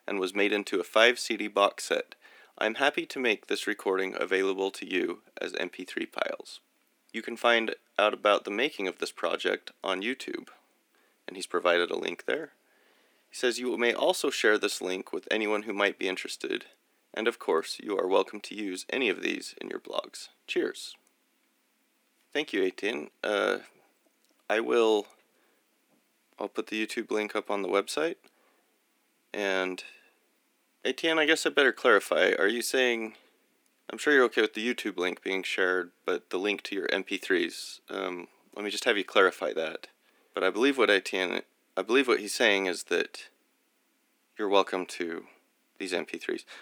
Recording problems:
thin; somewhat; fading below 250 Hz

